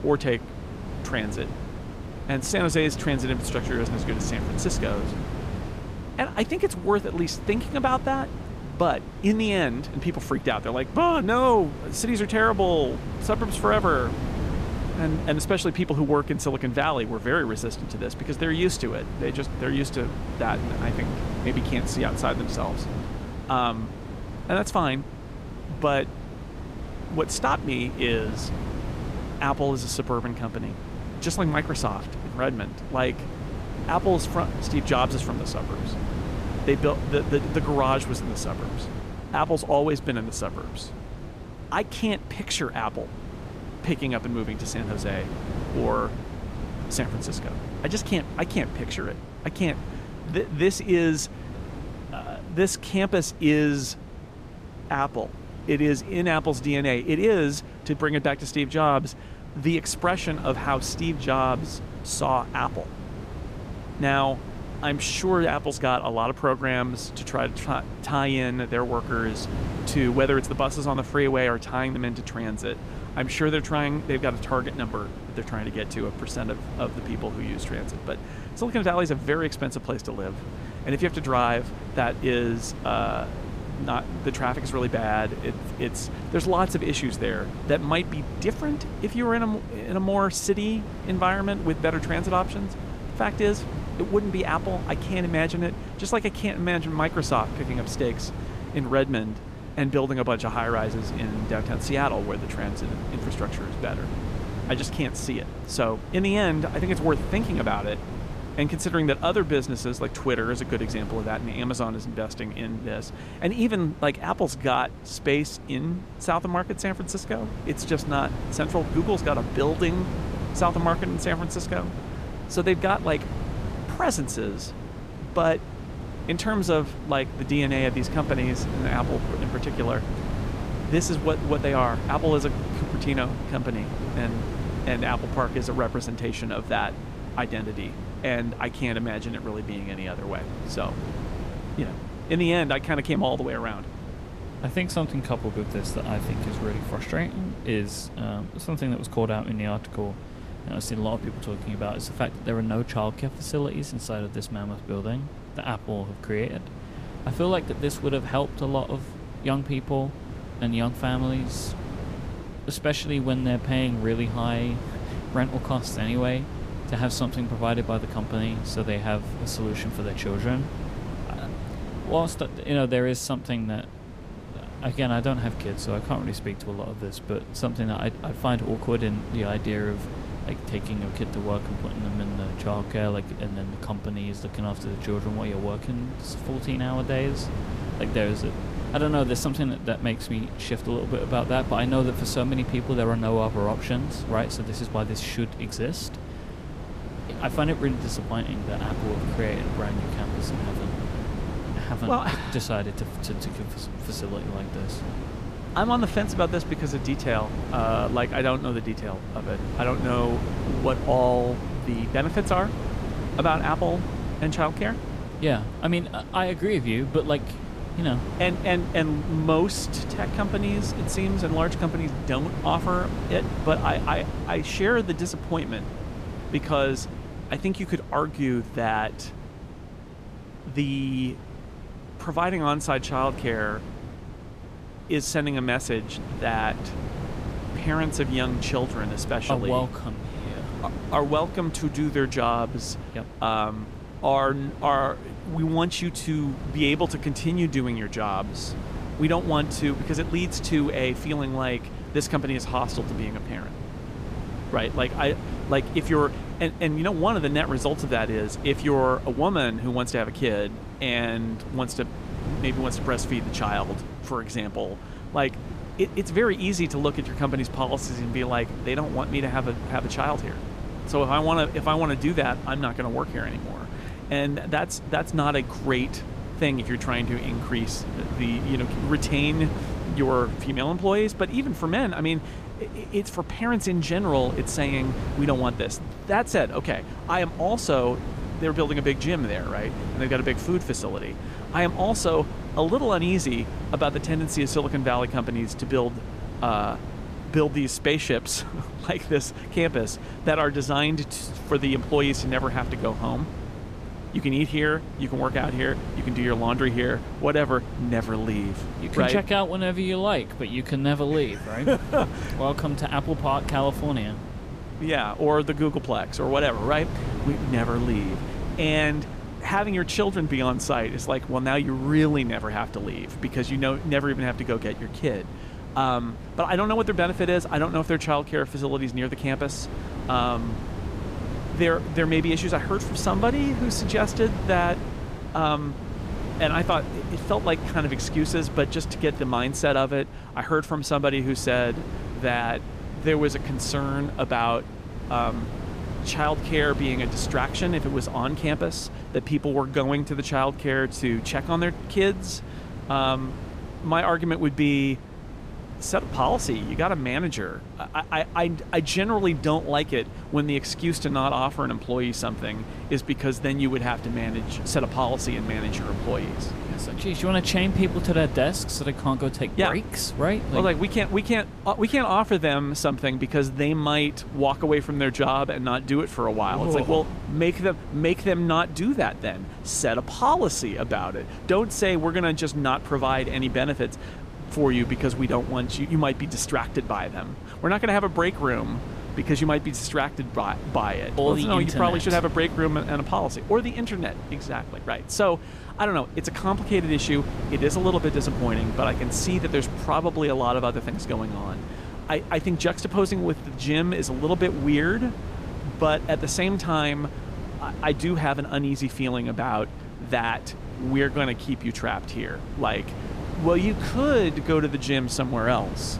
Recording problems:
wind noise on the microphone; occasional gusts; 15 dB below the speech

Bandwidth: 14.5 kHz